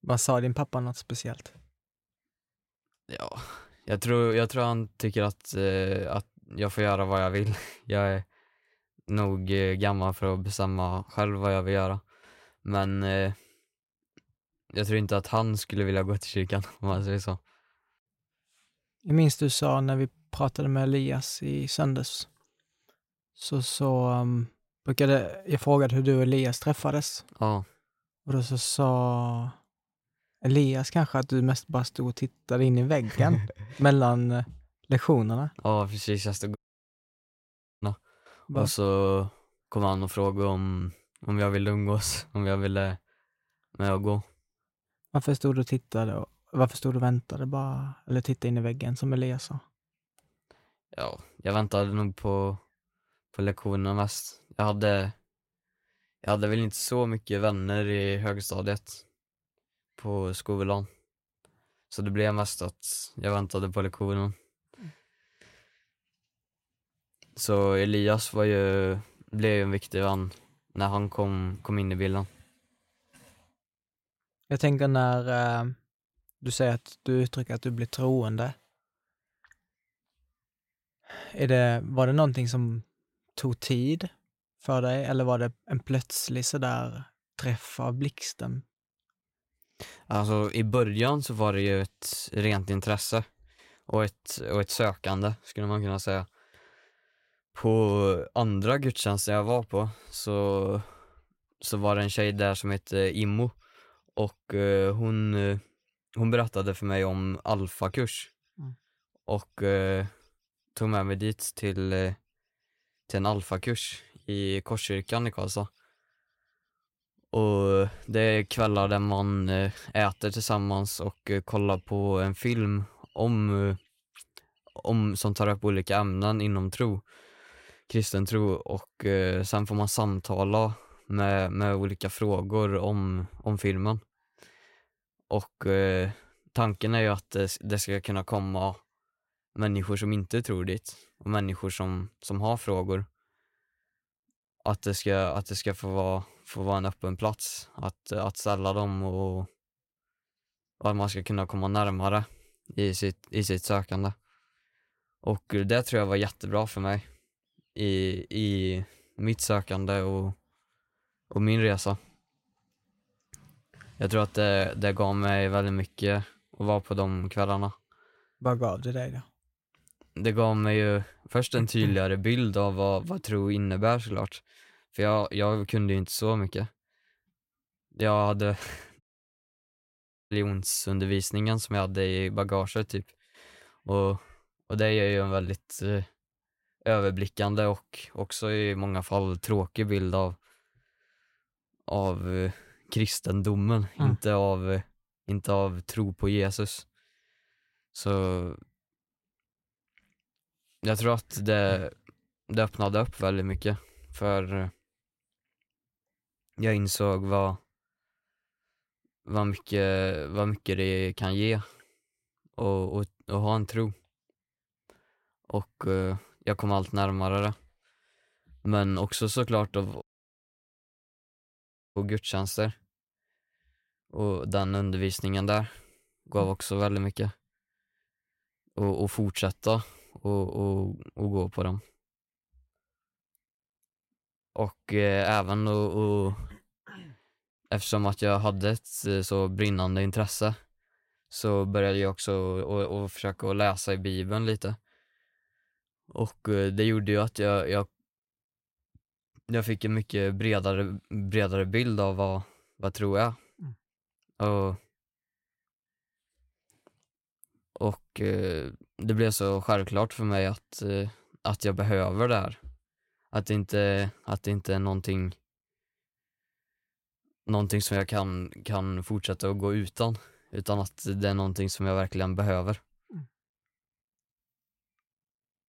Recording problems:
audio cutting out; at 37 s for 1.5 s, at 2:59 for 1.5 s and at 3:40 for 2 s

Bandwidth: 16 kHz